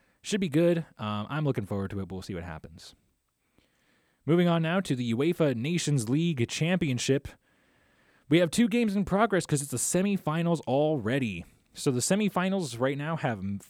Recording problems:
none

